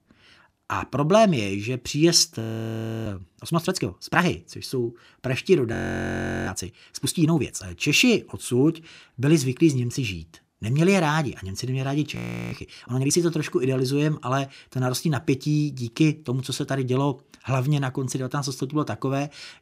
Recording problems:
audio freezing; at 2.5 s for 0.5 s, at 5.5 s for 0.5 s and at 12 s

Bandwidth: 15.5 kHz